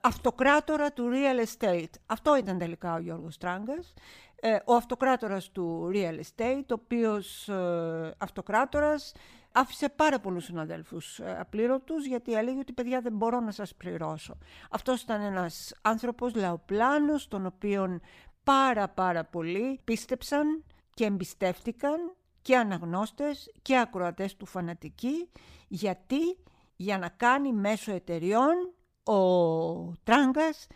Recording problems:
none

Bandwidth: 15 kHz